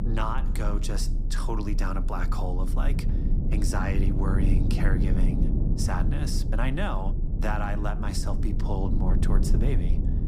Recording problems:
low rumble; loud; throughout; 5 dB below the speech

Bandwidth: 15 kHz